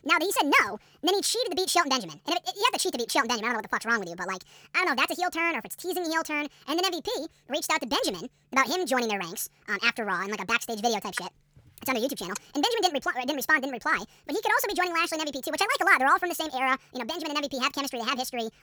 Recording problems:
wrong speed and pitch; too fast and too high; 1.6 times normal speed

